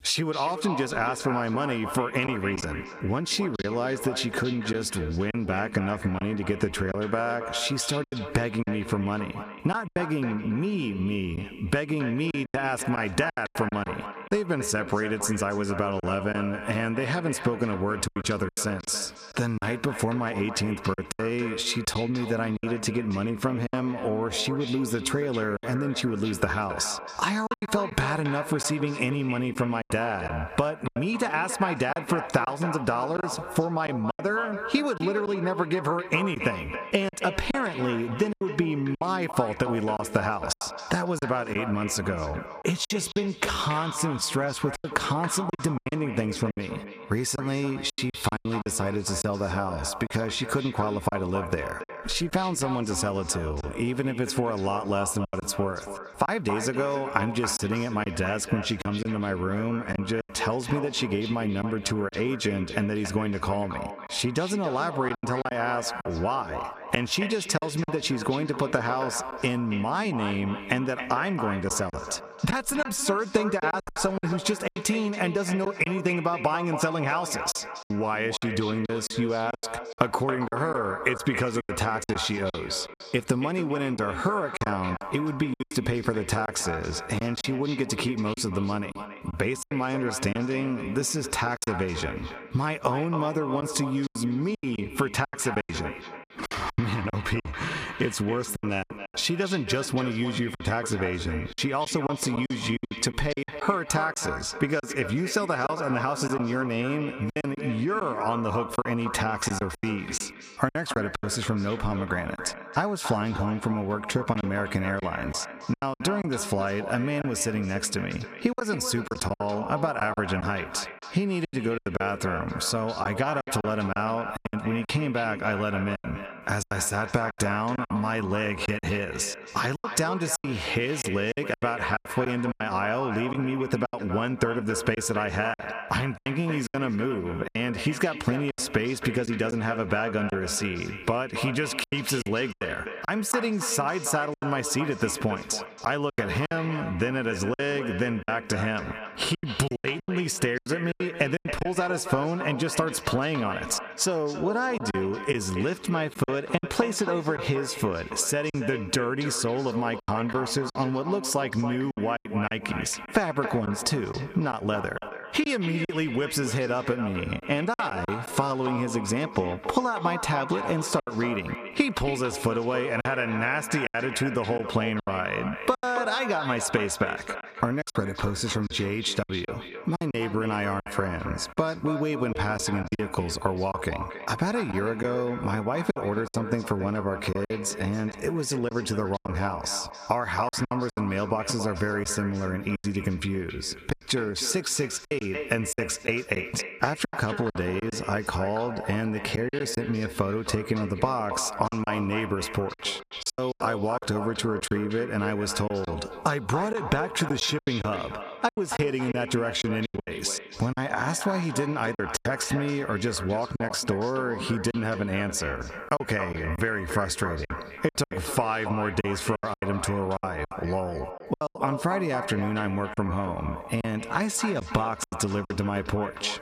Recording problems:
echo of what is said; strong; throughout; 280 ms later, 9 dB below the speech
squashed, flat; somewhat
choppy; very; 7% of the speech affected

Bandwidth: 14.5 kHz